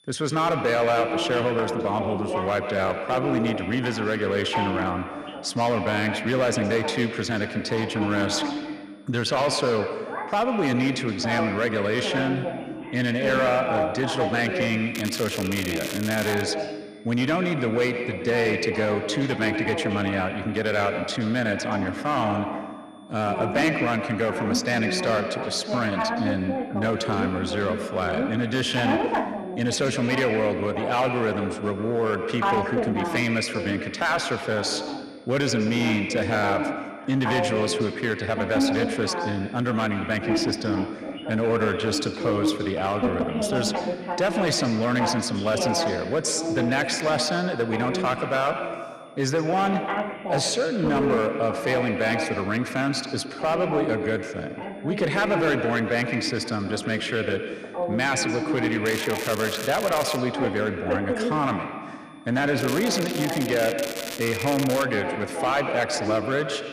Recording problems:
echo of what is said; strong; throughout; 120 ms later, 7 dB below the speech
distortion; slight; 6% of the sound clipped
voice in the background; loud; throughout; 5 dB below the speech
crackling; loud; from 15 to 16 s, from 59 s to 1:00 and from 1:03 to 1:05; 8 dB below the speech
high-pitched whine; faint; throughout; 3.5 kHz, 35 dB below the speech

